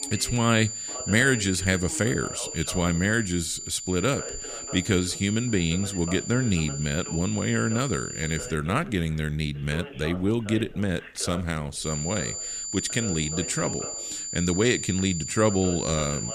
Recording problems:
high-pitched whine; loud; until 8.5 s and from 12 s on; 7 kHz, 6 dB below the speech
voice in the background; noticeable; throughout; 15 dB below the speech

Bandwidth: 15 kHz